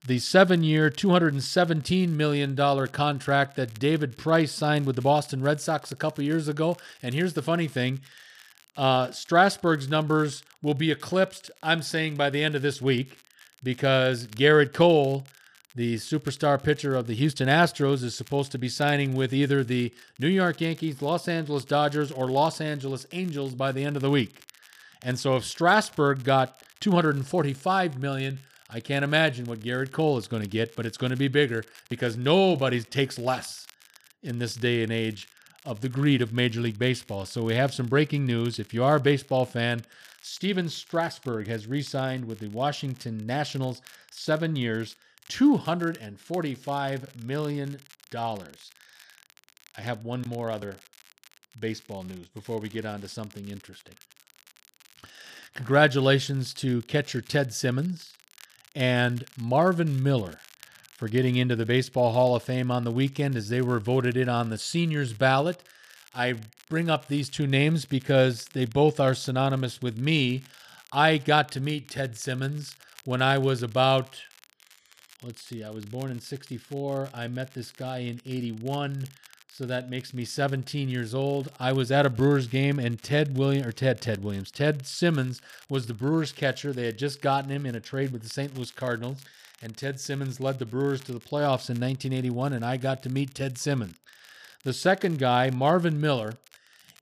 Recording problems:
crackle, like an old record; faint; 30 dB below the speech

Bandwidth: 14.5 kHz